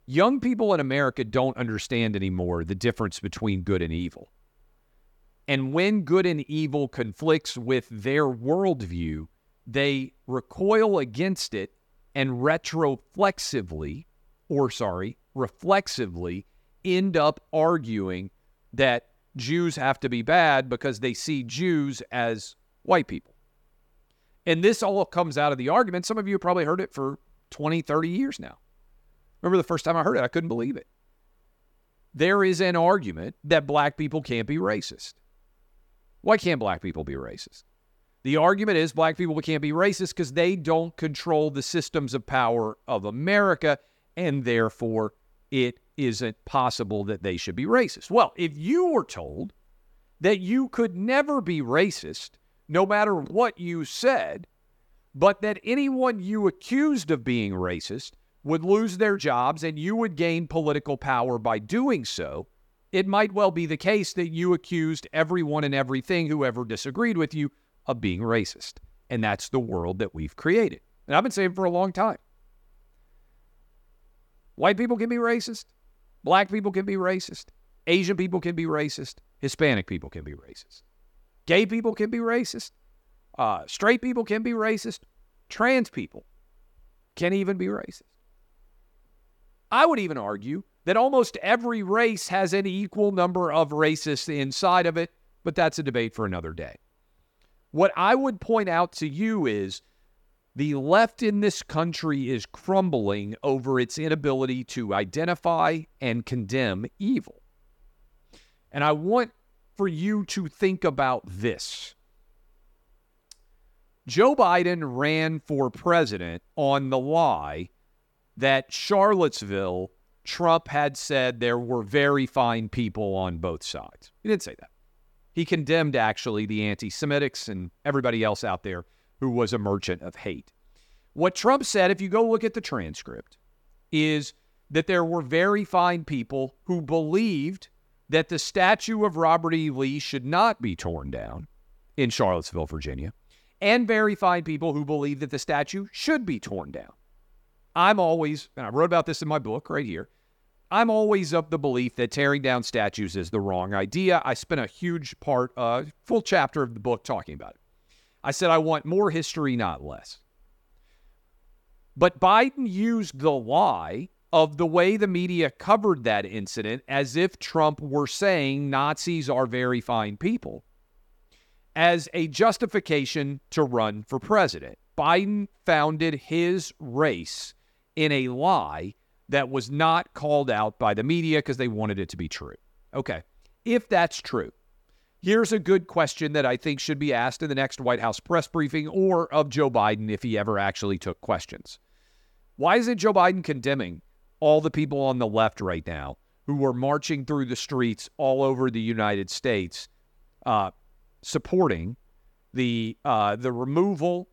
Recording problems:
none

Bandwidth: 17.5 kHz